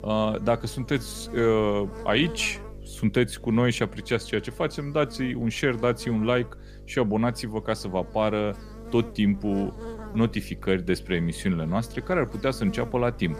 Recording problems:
electrical hum; noticeable; throughout; 50 Hz, 20 dB below the speech

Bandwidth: 15 kHz